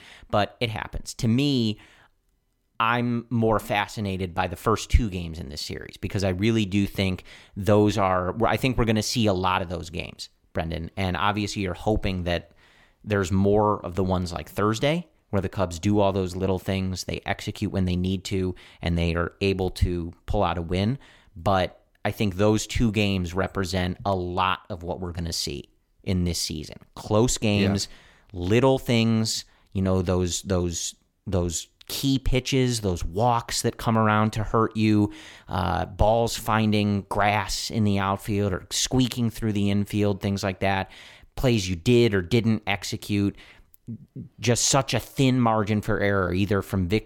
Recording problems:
none

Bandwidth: 17.5 kHz